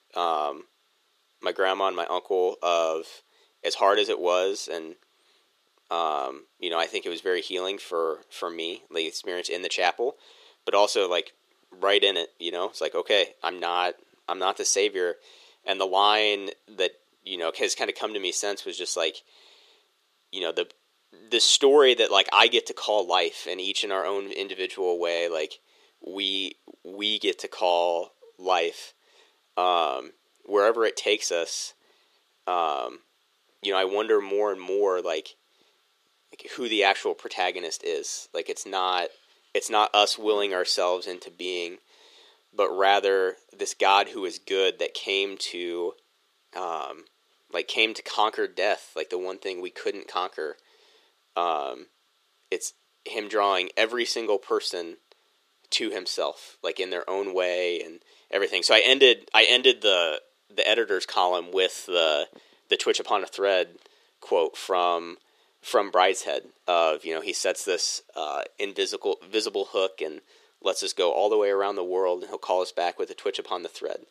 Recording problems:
thin; somewhat; fading below 400 Hz

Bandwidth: 14.5 kHz